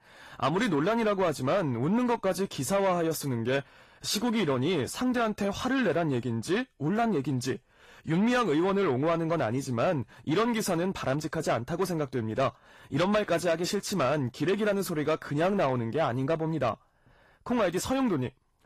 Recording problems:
distortion; slight; 10 dB below the speech
garbled, watery; slightly; nothing above 14.5 kHz

